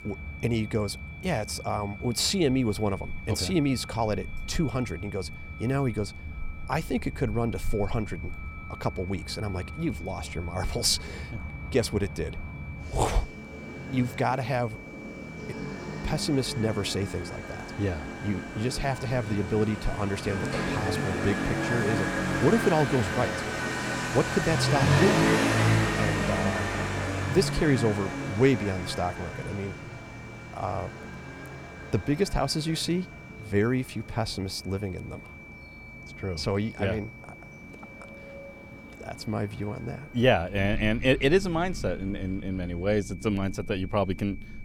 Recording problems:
traffic noise; loud; throughout; 4 dB below the speech
high-pitched whine; noticeable; throughout; 2.5 kHz, 15 dB below the speech

